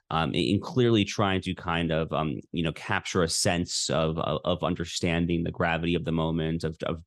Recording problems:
none

